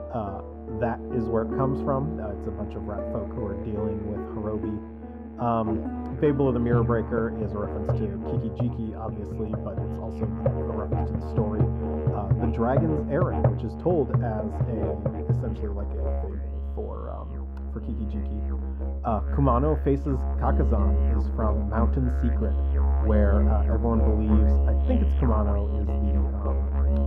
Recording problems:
muffled; very; fading above 2.5 kHz
background music; very loud; throughout; 2 dB above the speech

